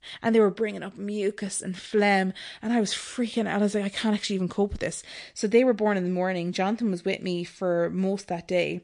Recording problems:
garbled, watery; slightly; nothing above 9.5 kHz

